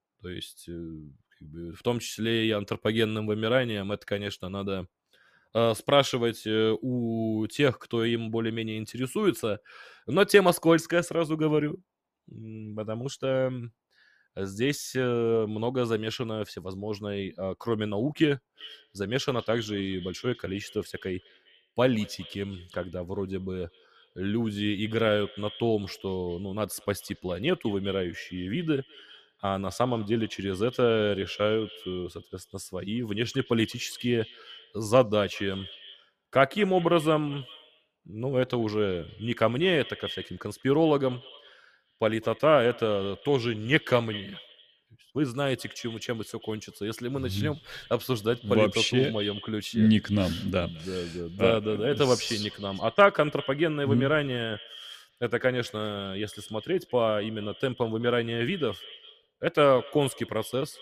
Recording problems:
echo of what is said; noticeable; from 19 s on; 200 ms later, 15 dB below the speech

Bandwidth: 14.5 kHz